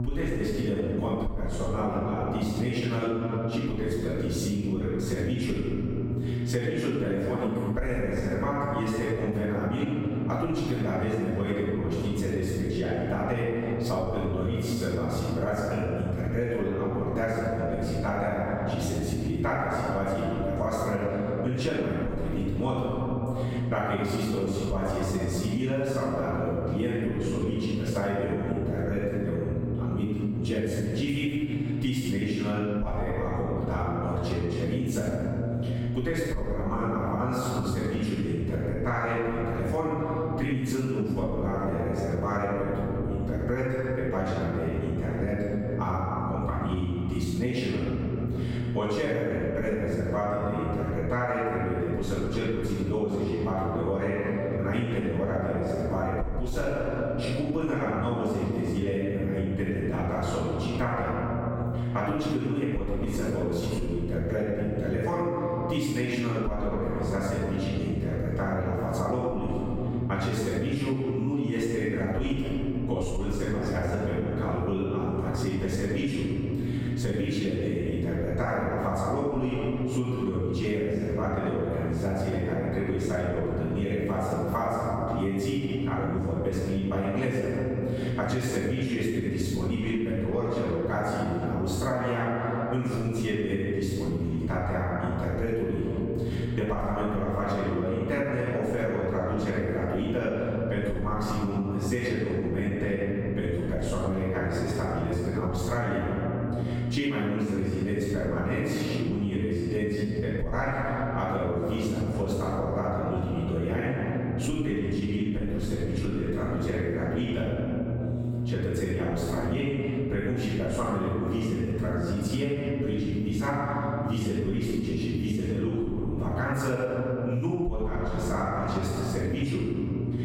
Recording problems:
room echo; strong; dies away in 1.9 s
off-mic speech; far
squashed, flat; somewhat
electrical hum; noticeable; throughout; 60 Hz, 15 dB below the speech

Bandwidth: 16 kHz